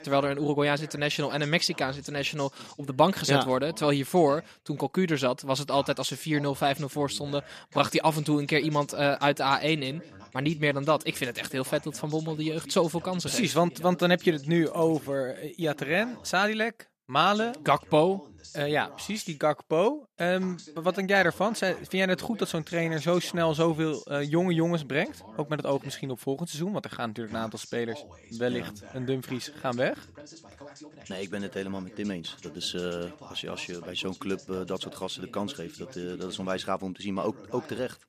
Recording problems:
voice in the background; noticeable; throughout; 20 dB below the speech

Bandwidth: 14.5 kHz